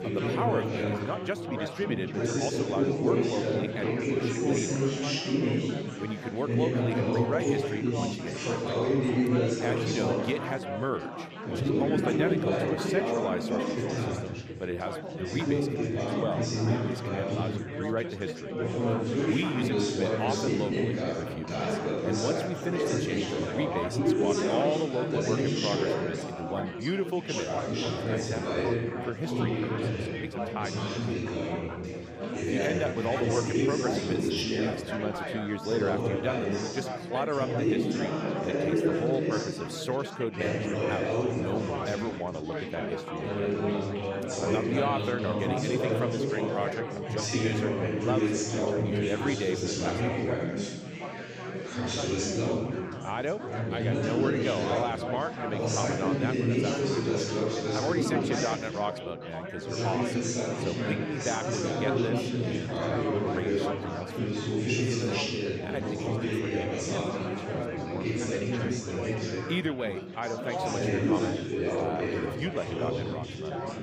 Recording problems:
chatter from many people; very loud; throughout; 5 dB above the speech

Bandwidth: 15.5 kHz